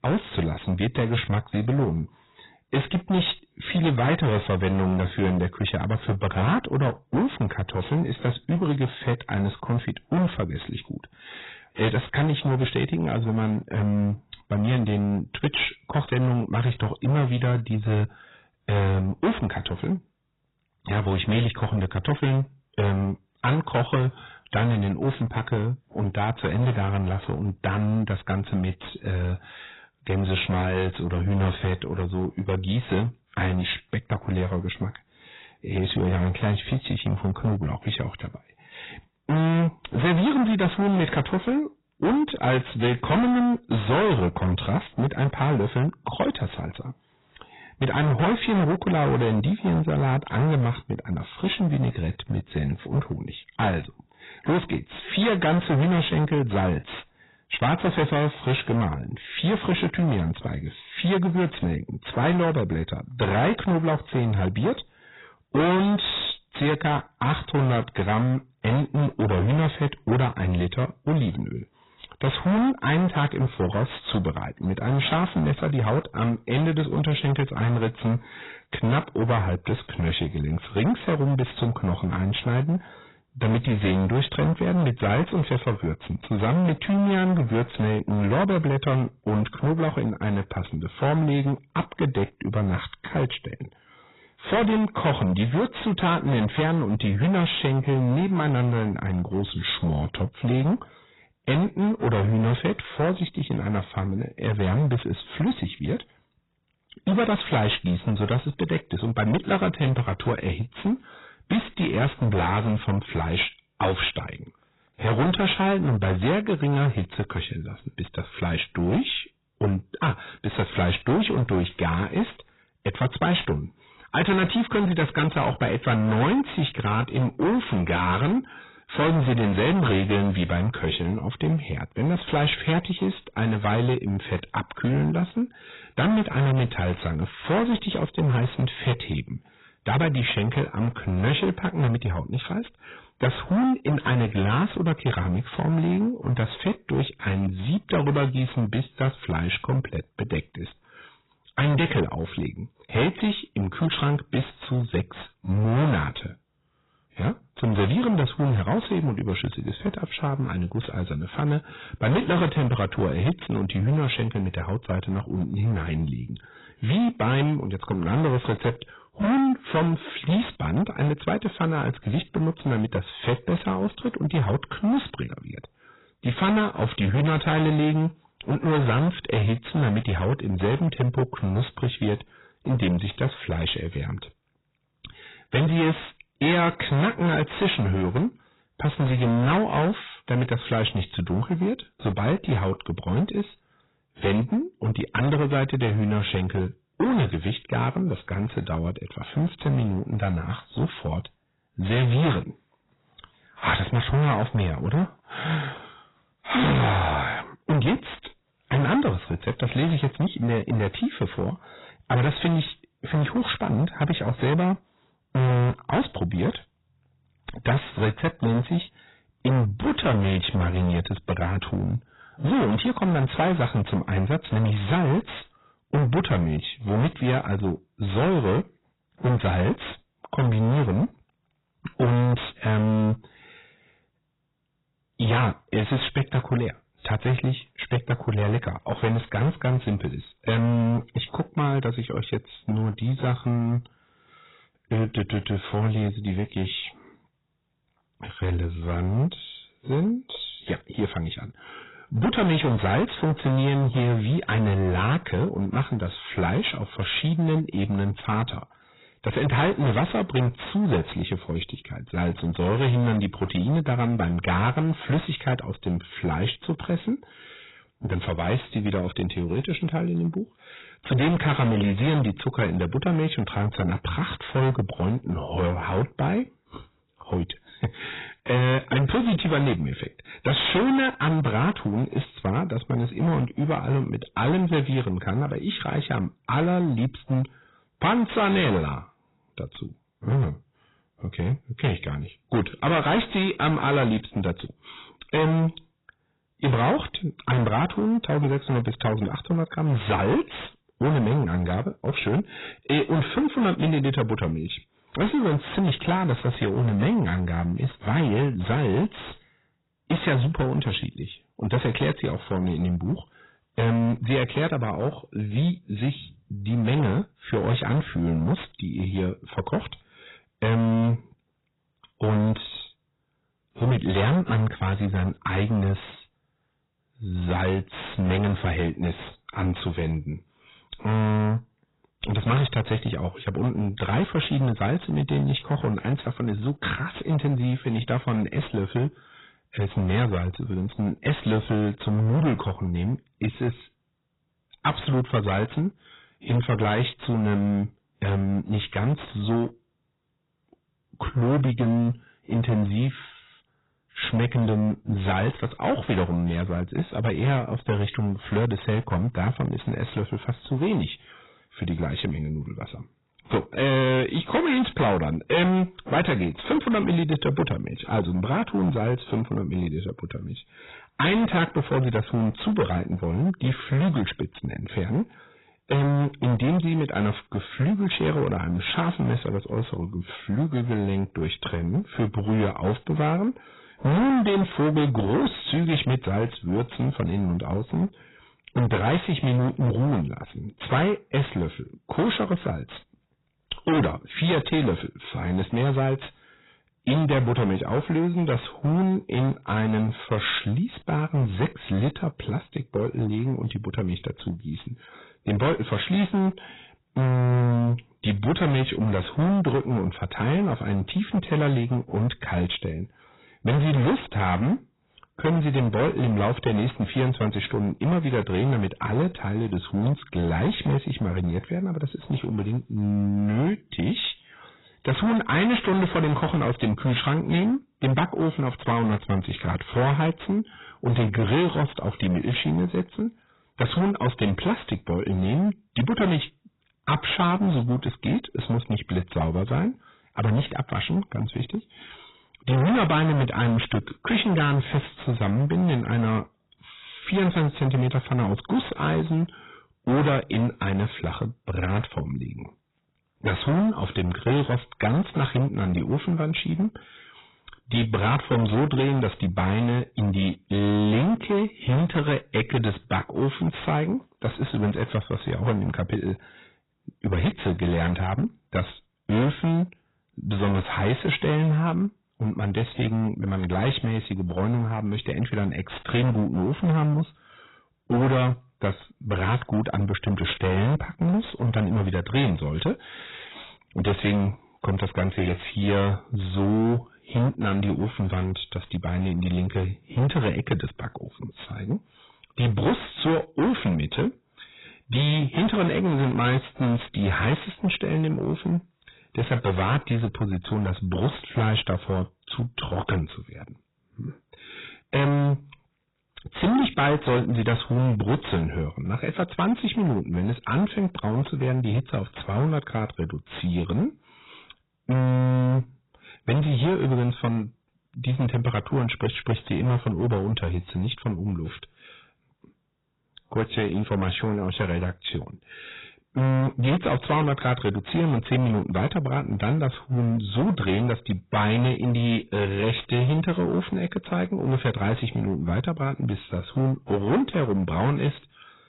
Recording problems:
distortion; heavy; 15% of the sound clipped
garbled, watery; badly; nothing above 4 kHz

